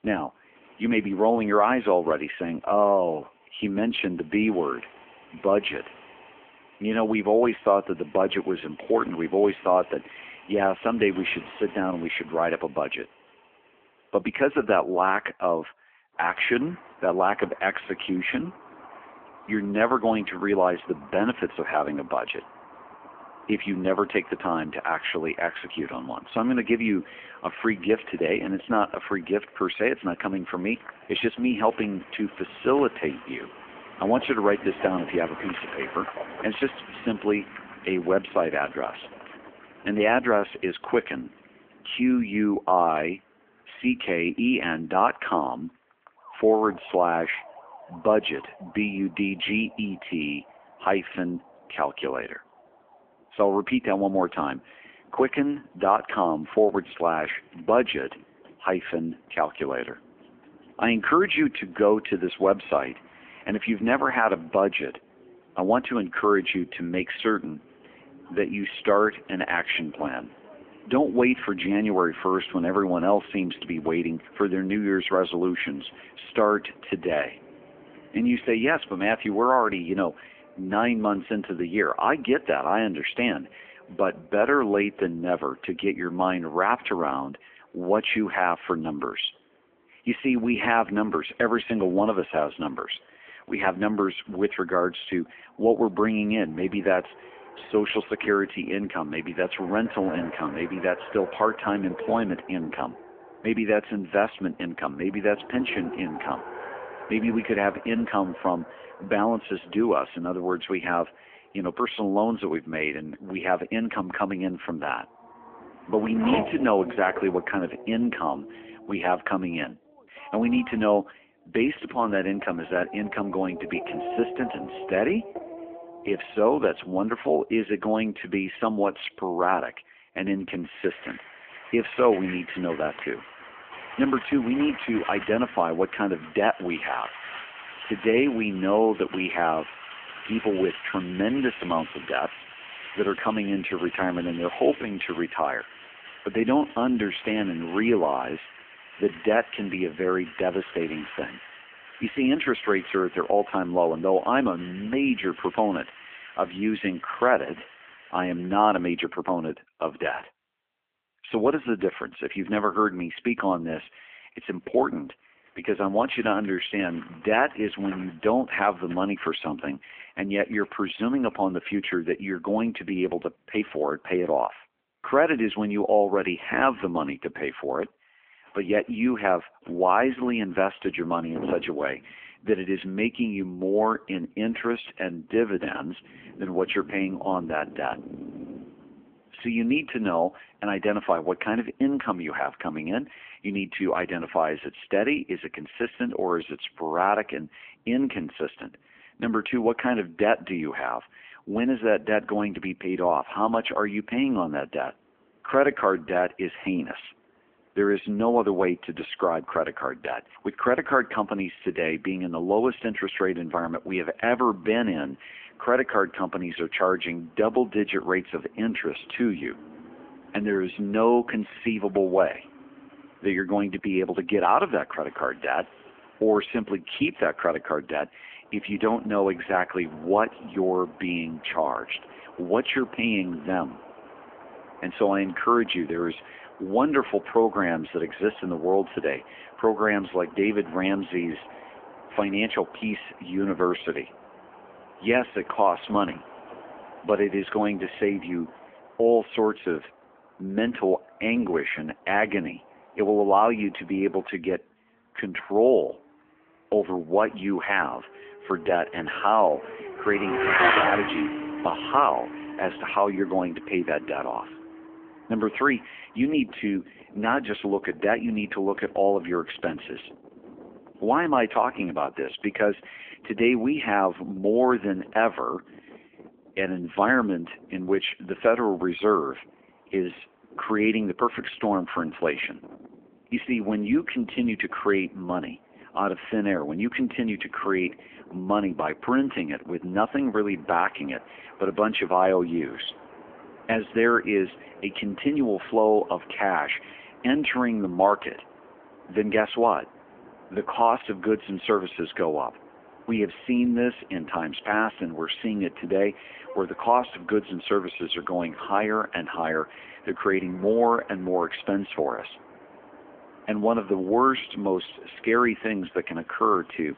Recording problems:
phone-call audio; poor line; nothing above 3.5 kHz
traffic noise; noticeable; throughout; 15 dB below the speech

